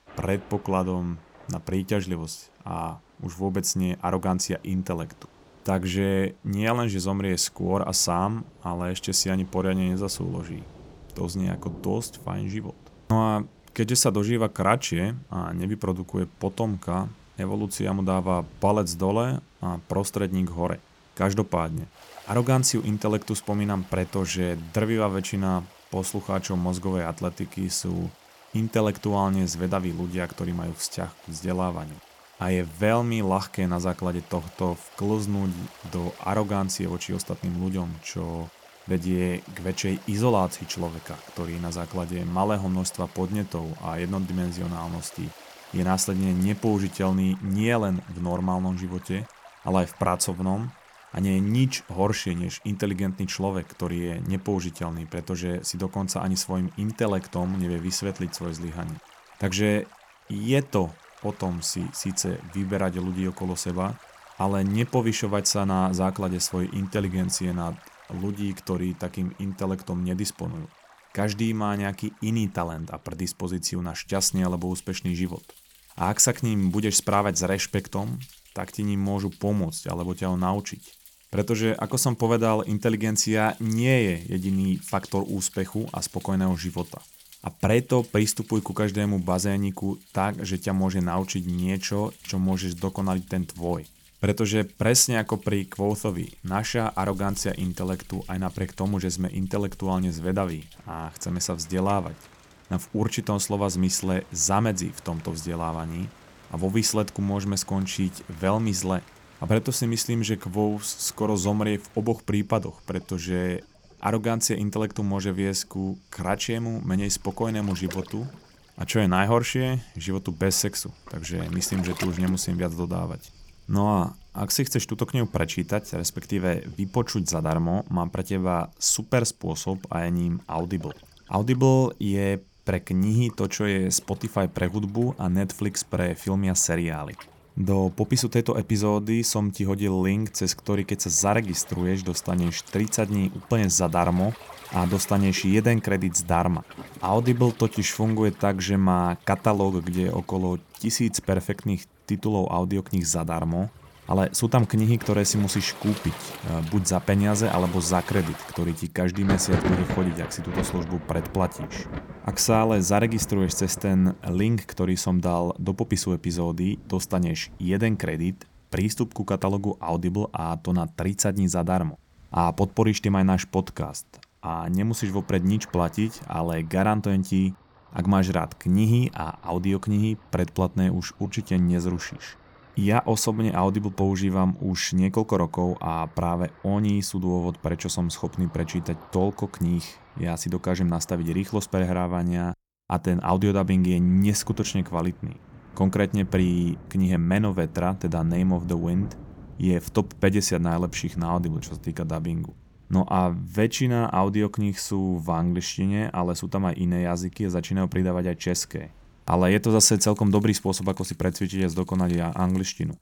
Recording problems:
rain or running water; noticeable; throughout; 20 dB below the speech

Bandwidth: 18.5 kHz